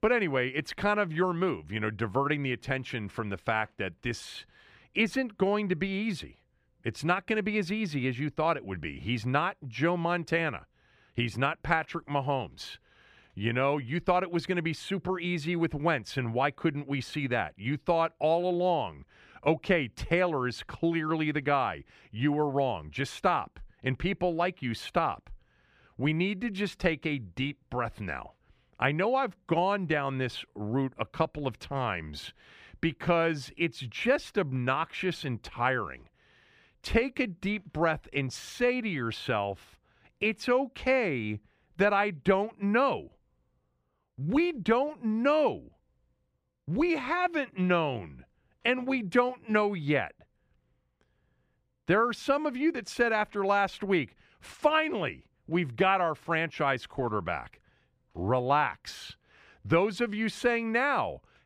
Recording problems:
none

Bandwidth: 15 kHz